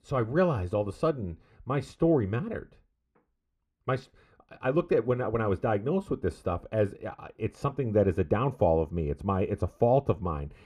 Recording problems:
muffled; slightly; fading above 3.5 kHz

